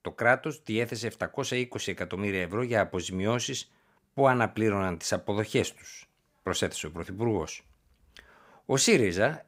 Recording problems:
none

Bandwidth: 15.5 kHz